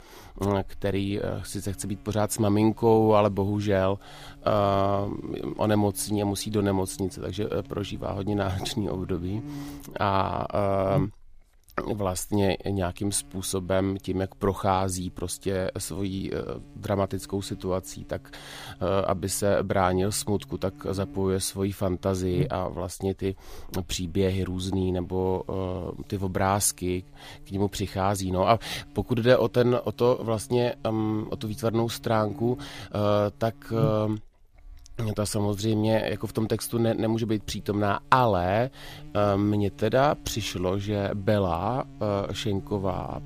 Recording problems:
electrical hum; faint; throughout; 50 Hz, 25 dB below the speech

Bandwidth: 15 kHz